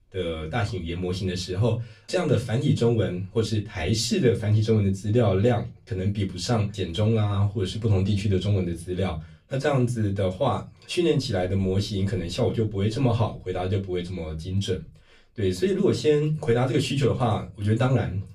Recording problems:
off-mic speech; far
room echo; very slight; dies away in 0.2 s

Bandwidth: 15.5 kHz